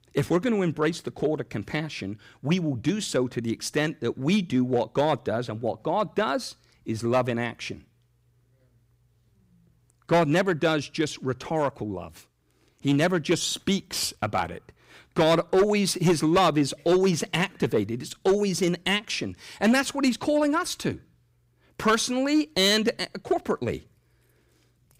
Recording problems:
distortion; slight; 3% of the sound clipped

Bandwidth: 15.5 kHz